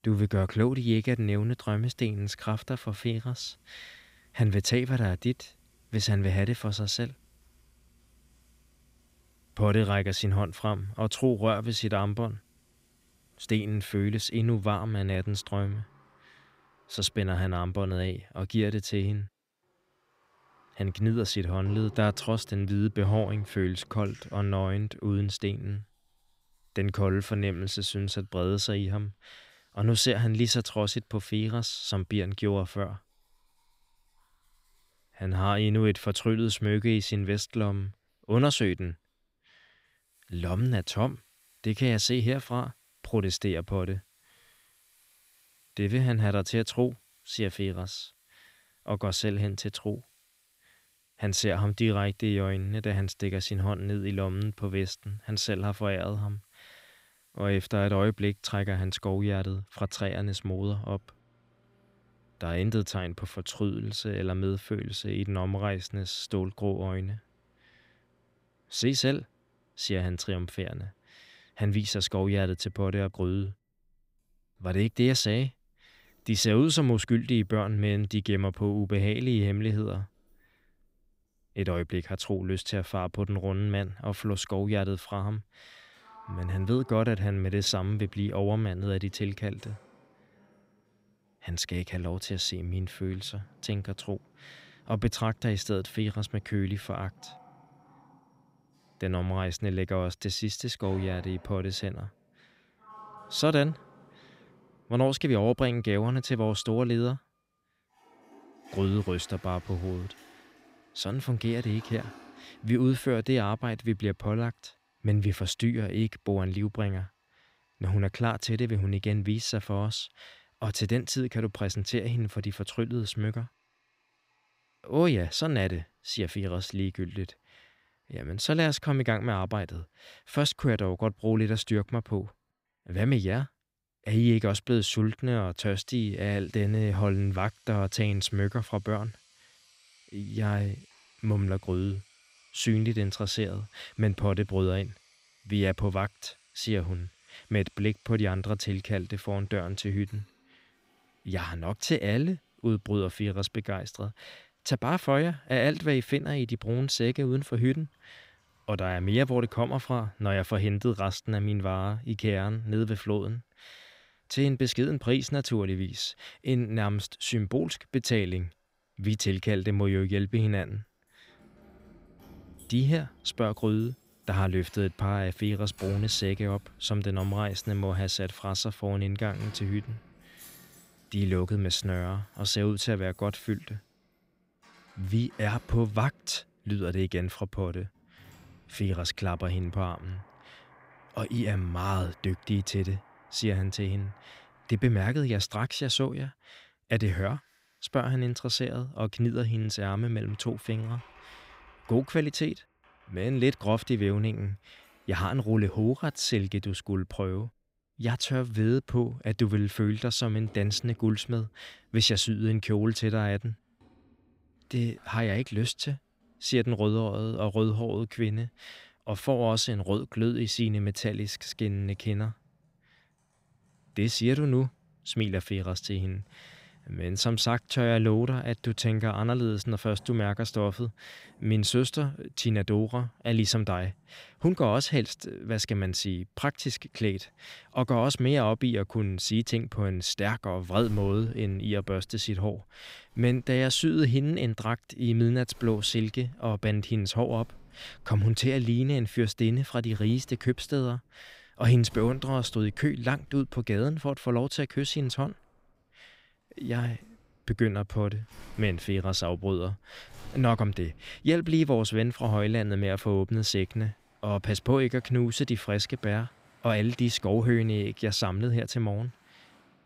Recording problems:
household noises; faint; throughout; 30 dB below the speech

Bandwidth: 15.5 kHz